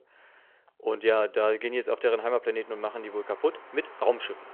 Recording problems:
phone-call audio
traffic noise; noticeable; throughout; 20 dB below the speech

